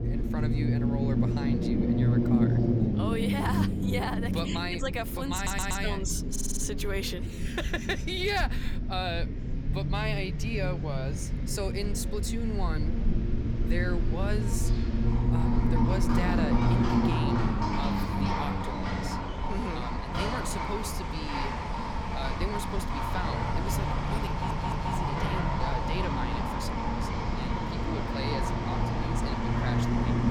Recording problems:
animal sounds; very loud; throughout; 2 dB above the speech
low rumble; loud; throughout; 2 dB below the speech
background chatter; faint; throughout; 3 voices, 30 dB below the speech
audio stuttering; at 5.5 s, at 6.5 s and at 24 s

